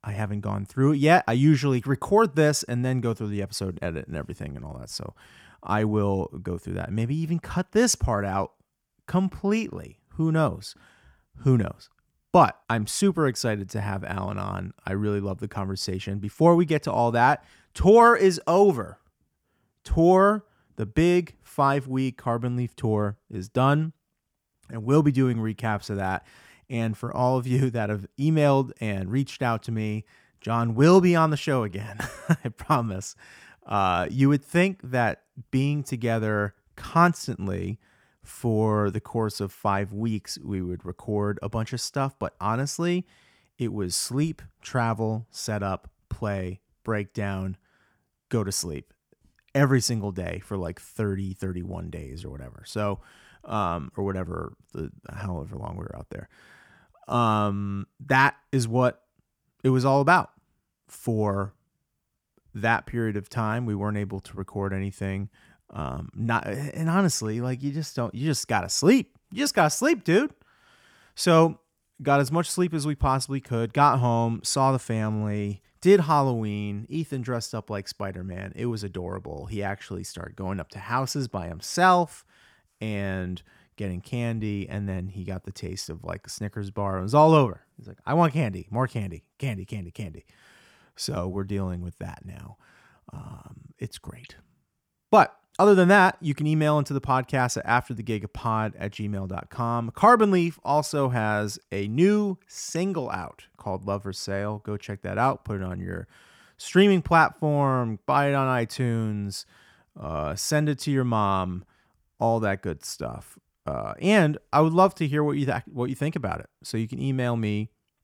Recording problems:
none

